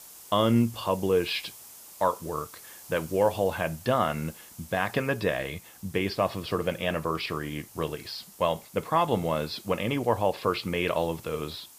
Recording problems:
high frequencies cut off; noticeable; nothing above 5.5 kHz
hiss; noticeable; throughout; 20 dB below the speech

